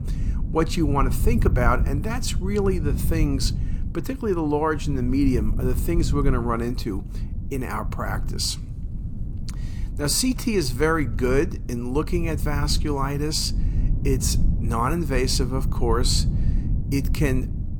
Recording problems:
low rumble; noticeable; throughout; 15 dB below the speech

